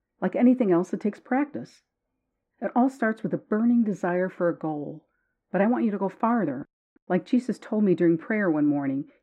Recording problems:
muffled; very; fading above 3.5 kHz

